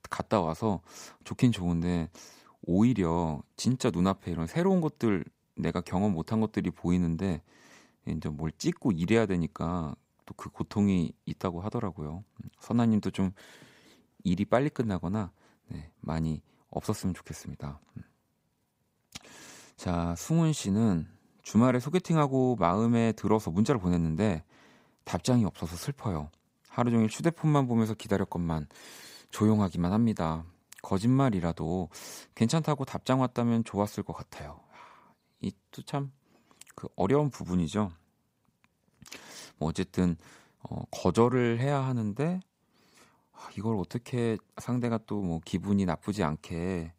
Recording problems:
none

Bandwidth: 15.5 kHz